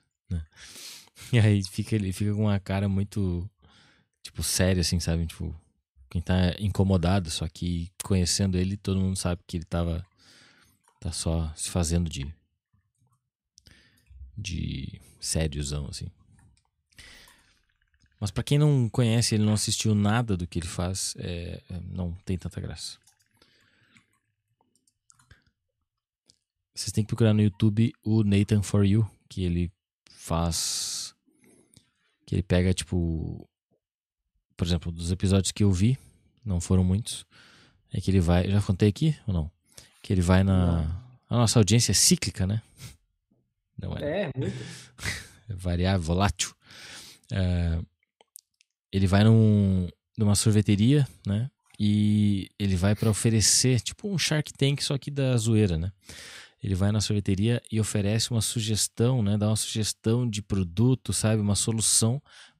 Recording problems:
none

